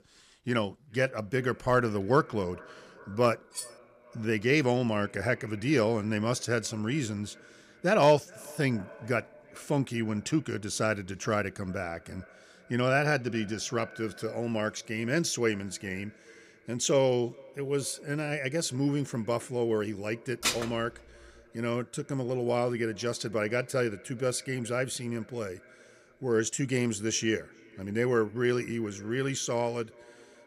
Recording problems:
echo of what is said; faint; throughout; 410 ms later, 25 dB below the speech
clattering dishes; noticeable; at 3.5 s; peak 9 dB below the speech
clattering dishes; loud; at 20 s; peak level with the speech

